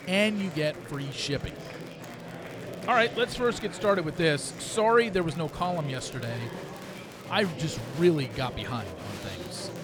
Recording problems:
murmuring crowd; noticeable; throughout; 10 dB below the speech
crackle, like an old record; faint; 30 dB below the speech

